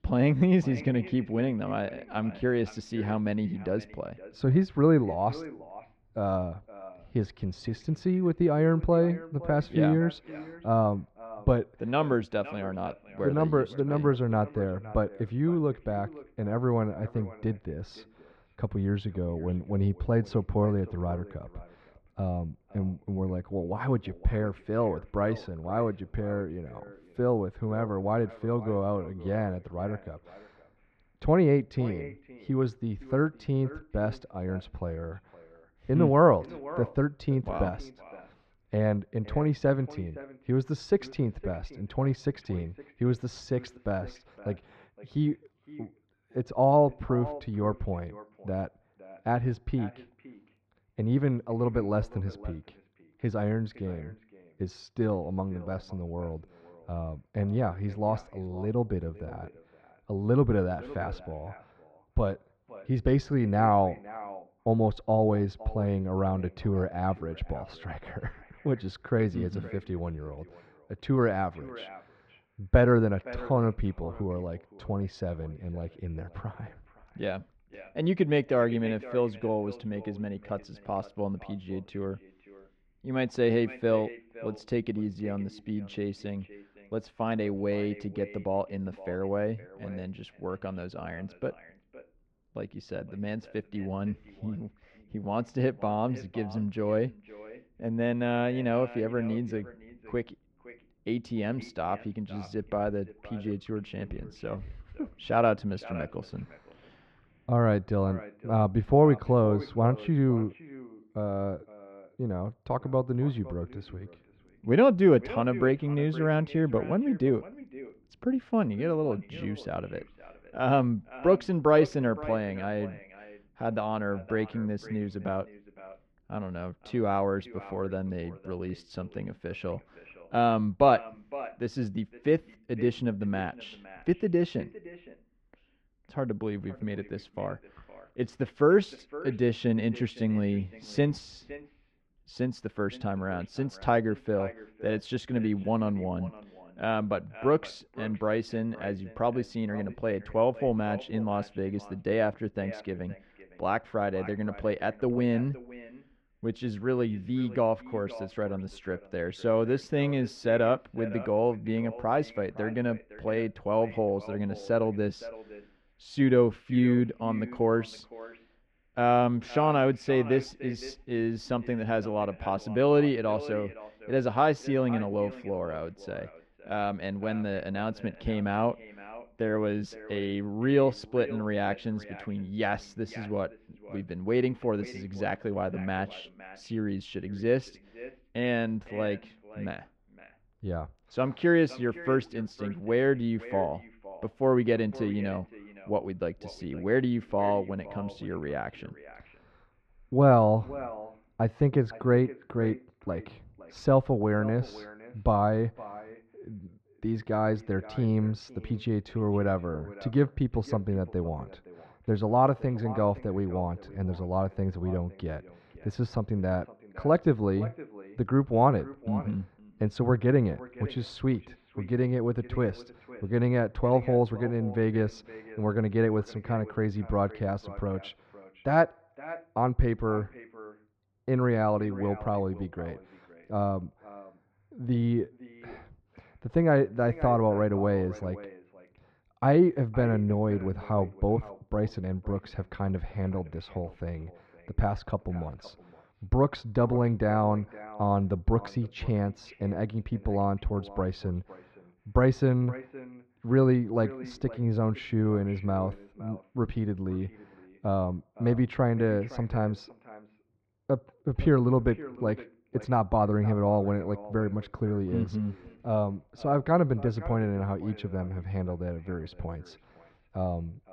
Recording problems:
muffled; very; fading above 1.5 kHz
echo of what is said; faint; throughout; 510 ms later, 20 dB below the speech

